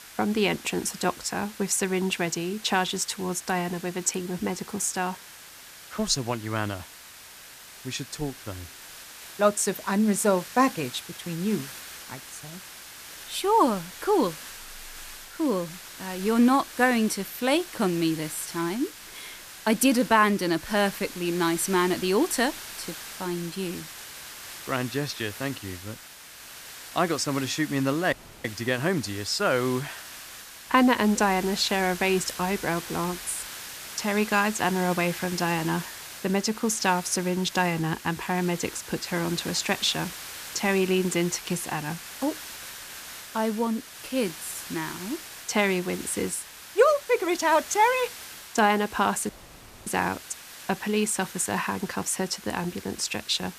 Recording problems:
hiss; noticeable; throughout; 15 dB below the speech
audio cutting out; at 28 s and at 49 s for 0.5 s

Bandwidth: 14.5 kHz